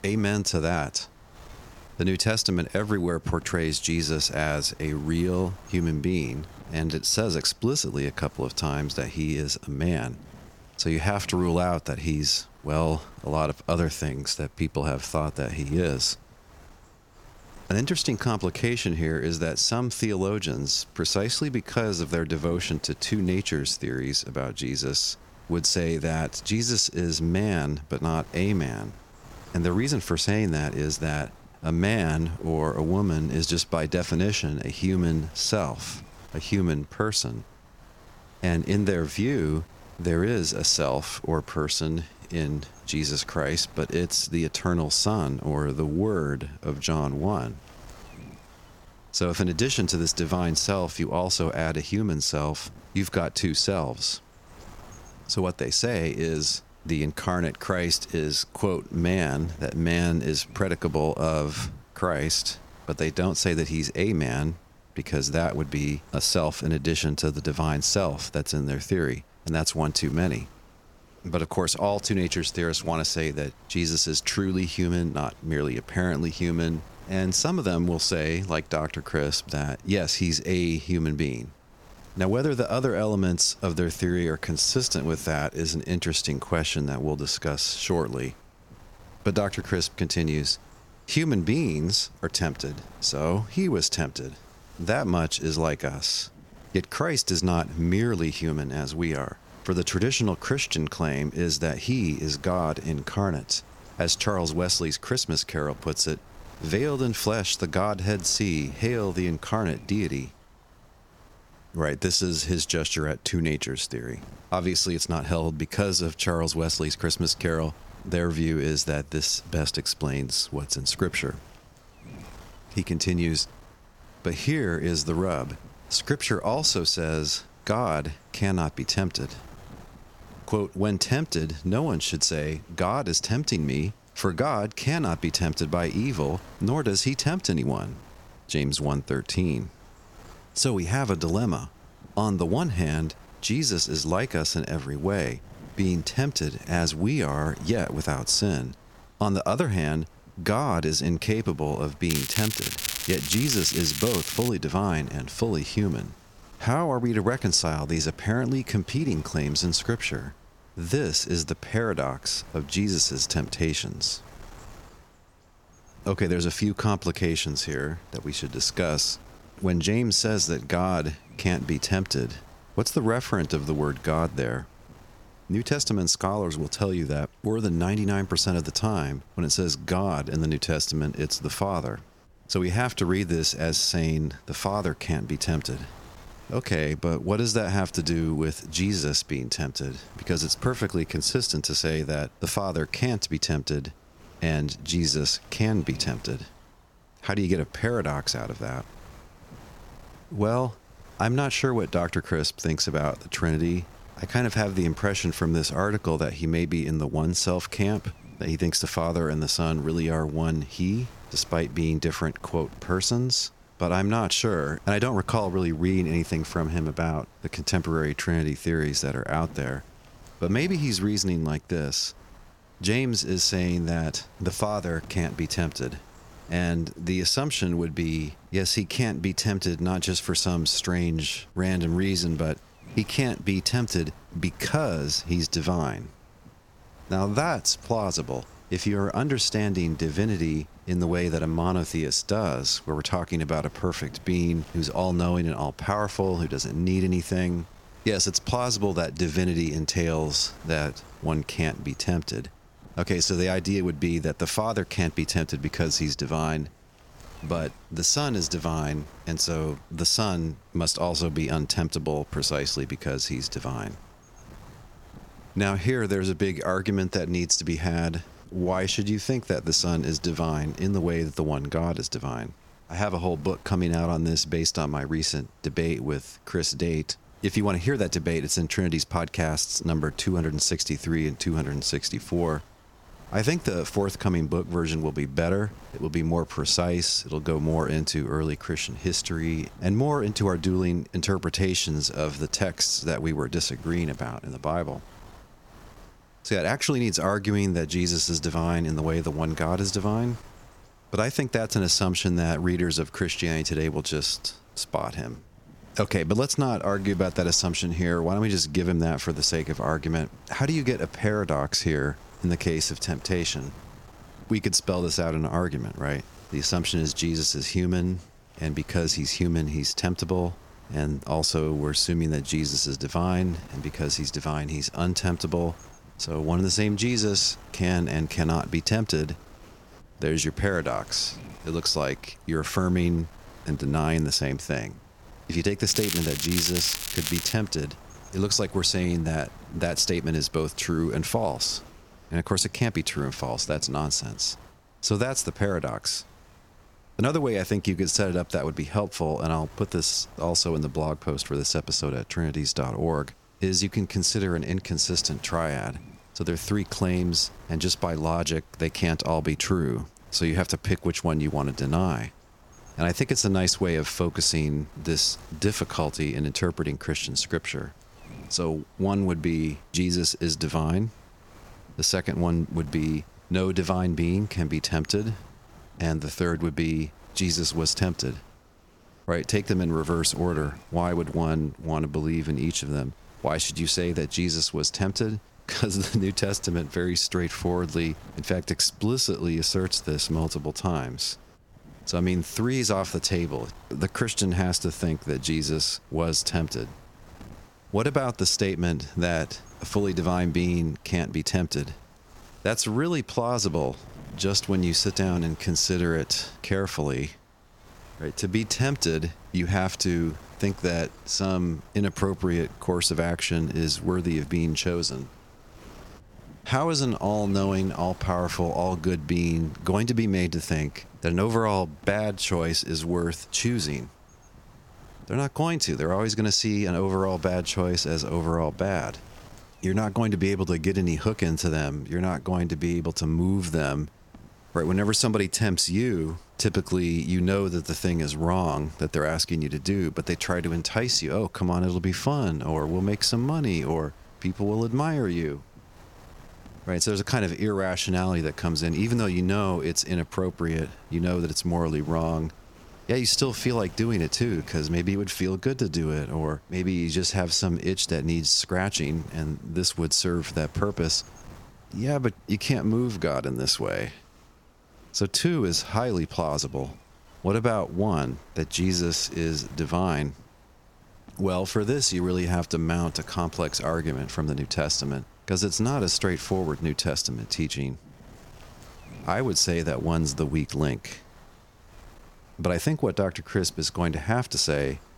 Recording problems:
crackling; loud; from 2:32 to 2:35 and from 5:36 to 5:38; 3 dB below the speech
wind noise on the microphone; occasional gusts; 25 dB below the speech

